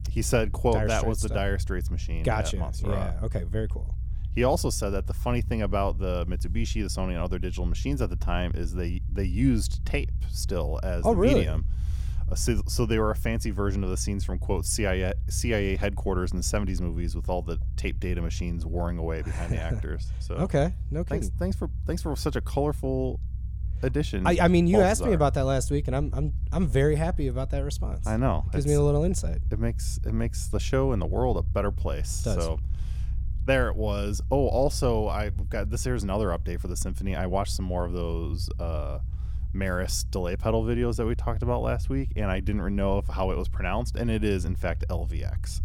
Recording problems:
low rumble; faint; throughout; 20 dB below the speech

